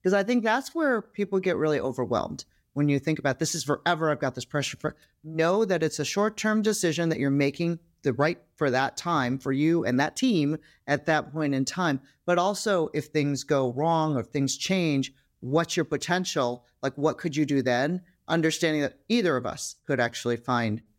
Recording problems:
uneven, jittery; slightly; from 1 to 11 s

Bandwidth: 16 kHz